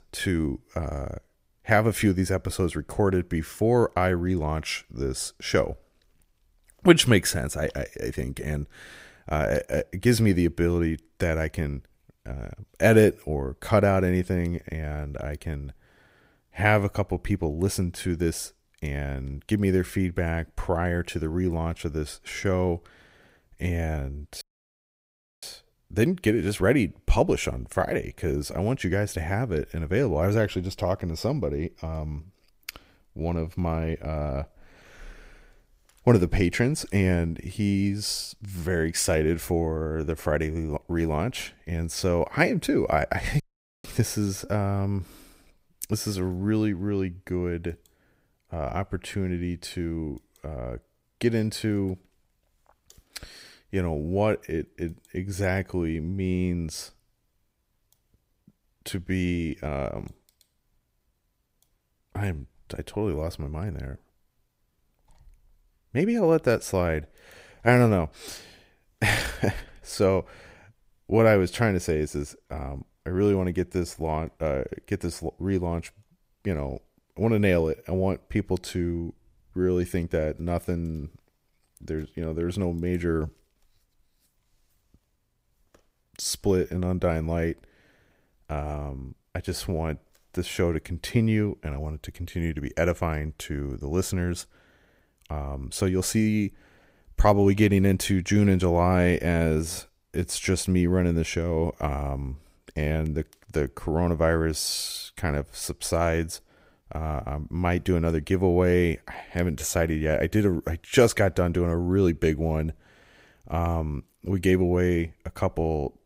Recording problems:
audio cutting out; at 24 s for 1 s and at 43 s

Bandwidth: 15.5 kHz